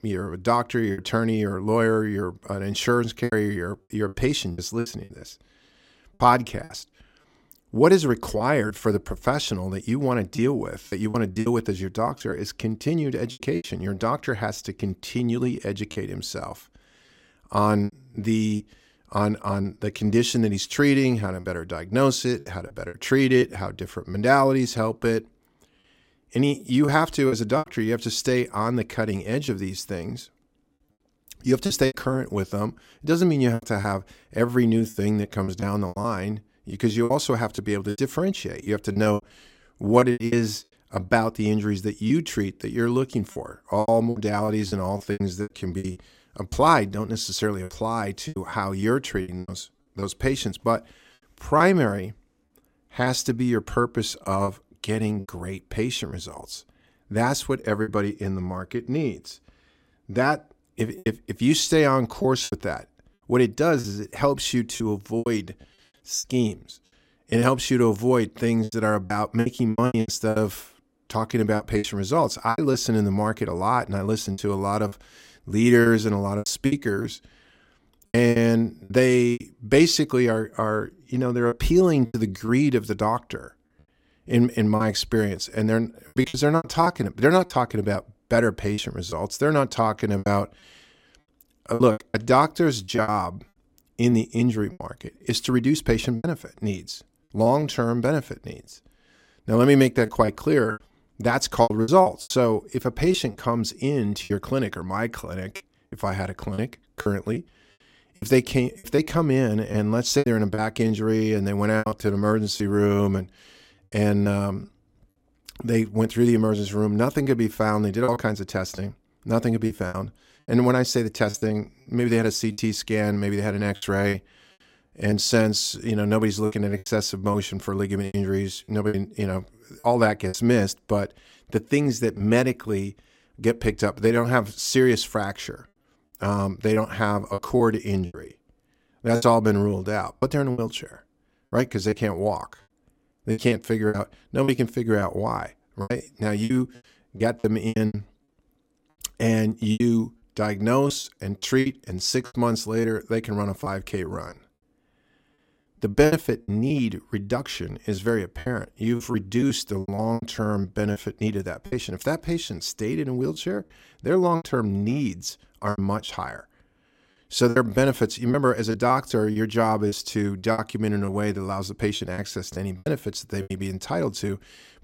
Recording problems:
choppy; very; 8% of the speech affected

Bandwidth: 16 kHz